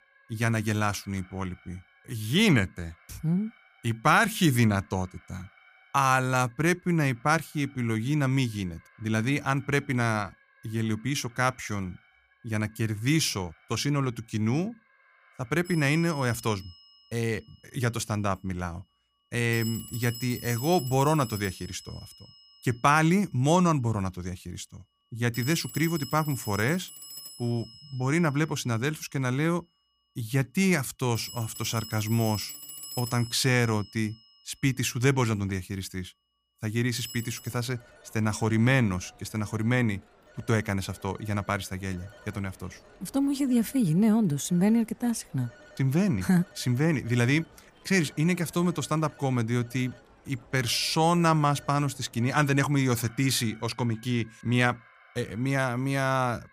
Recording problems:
alarms or sirens; noticeable; throughout; 20 dB below the speech

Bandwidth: 15 kHz